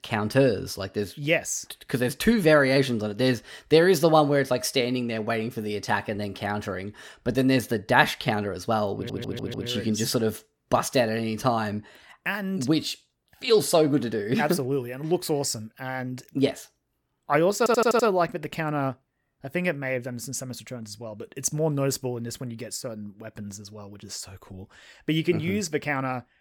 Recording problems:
audio stuttering; at 9 s and at 18 s

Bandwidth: 17.5 kHz